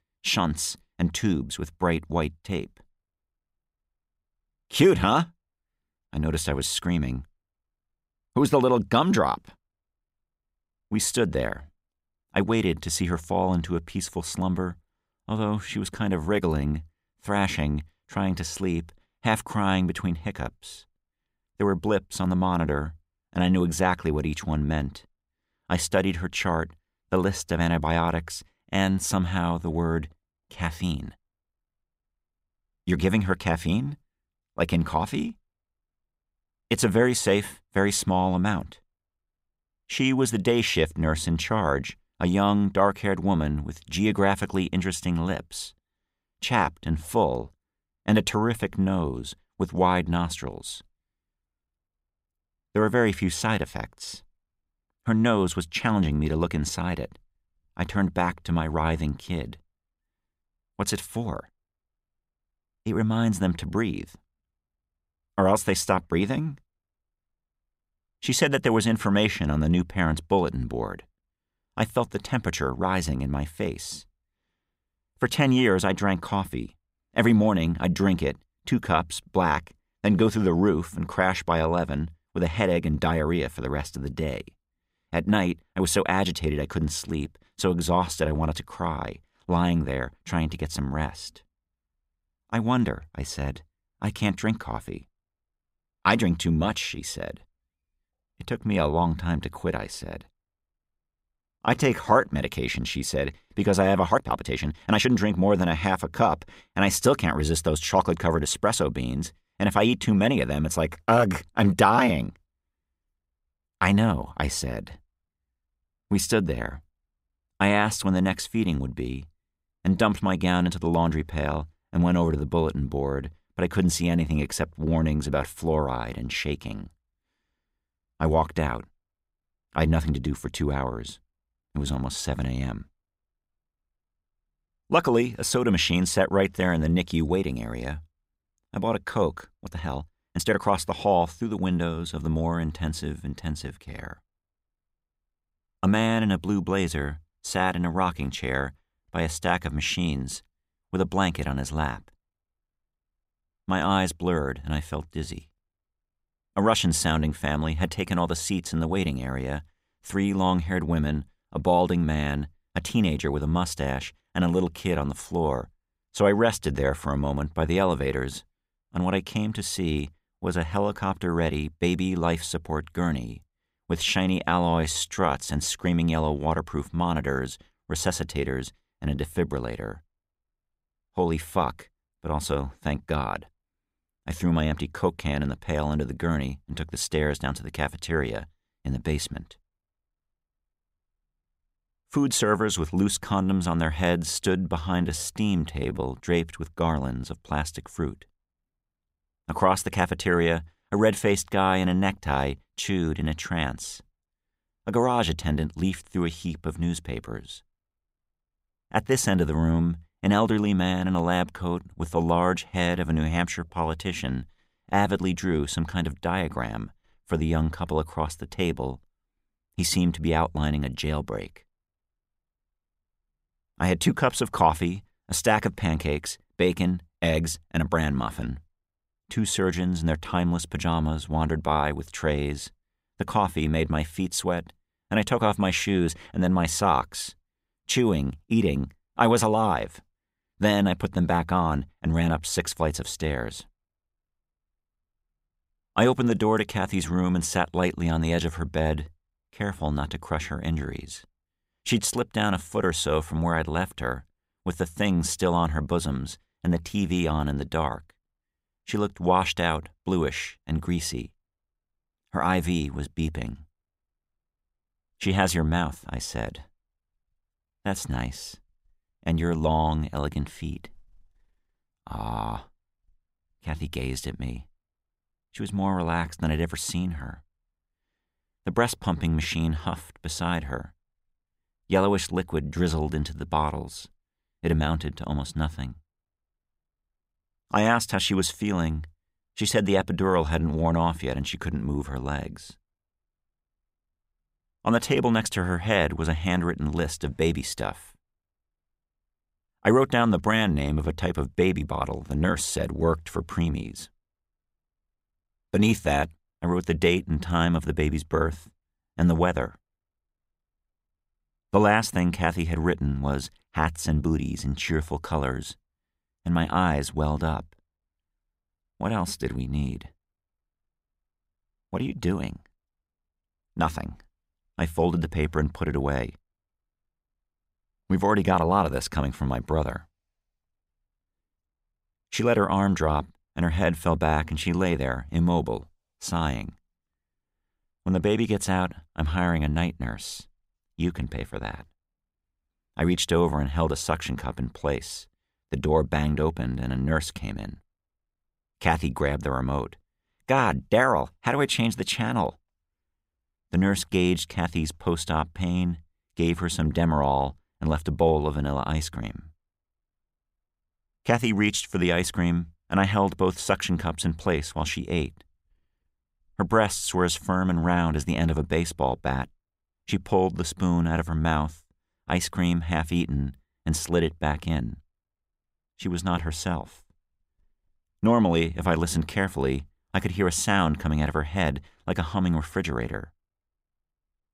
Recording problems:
uneven, jittery; strongly; from 1:41 to 3:16

